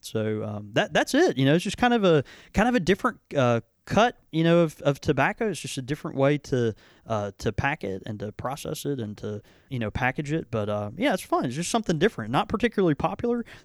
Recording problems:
none

